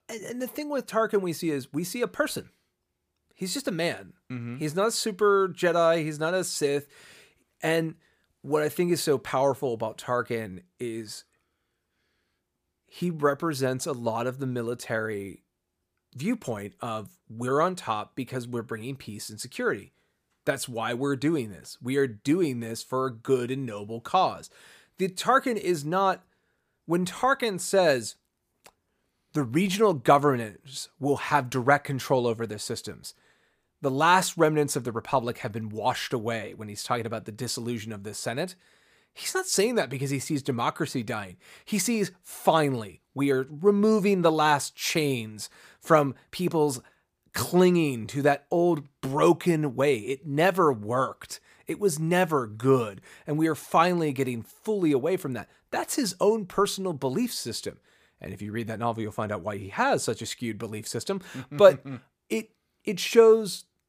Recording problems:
none

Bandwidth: 15 kHz